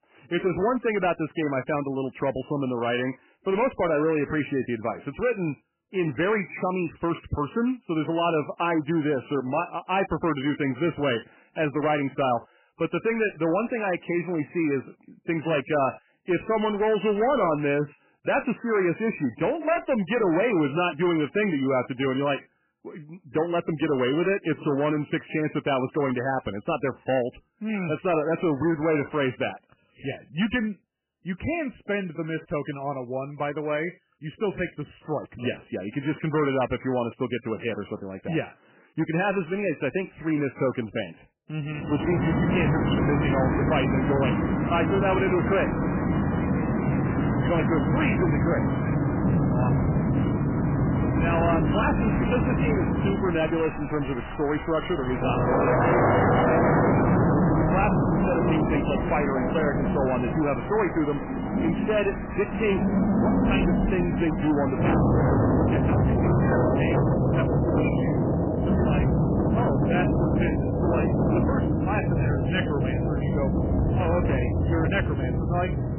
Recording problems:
distortion; heavy; 15% of the sound clipped
garbled, watery; badly; nothing above 3 kHz
rain or running water; very loud; from 42 s on; 3 dB above the speech

